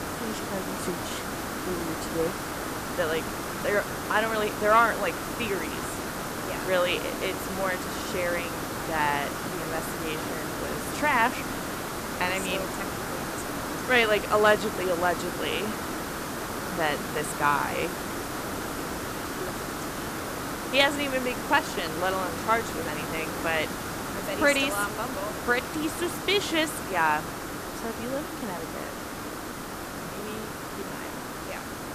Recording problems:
hiss; loud; throughout; 5 dB below the speech

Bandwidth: 14.5 kHz